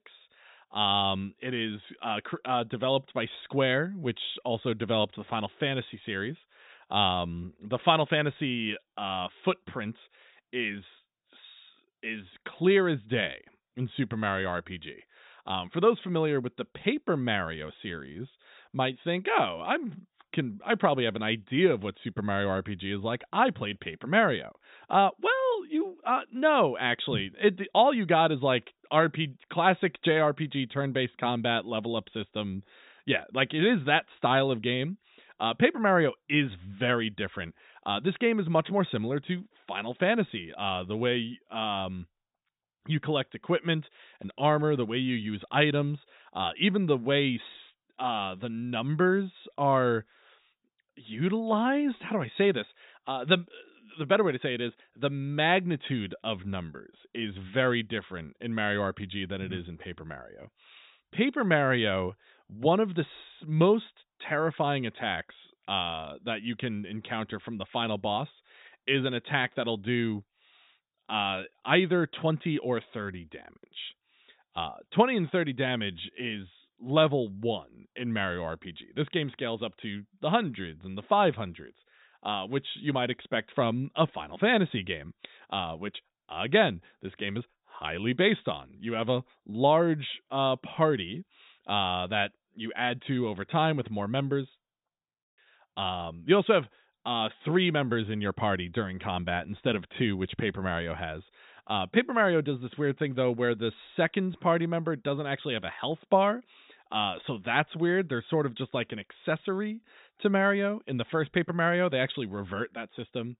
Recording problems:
high frequencies cut off; severe; nothing above 4 kHz

